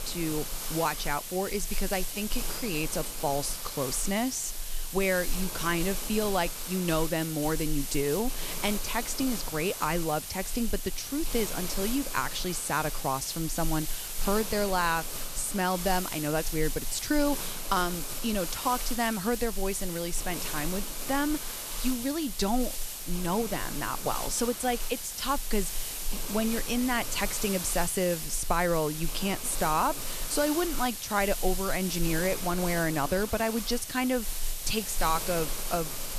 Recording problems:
hiss; loud; throughout; 4 dB below the speech

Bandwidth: 14 kHz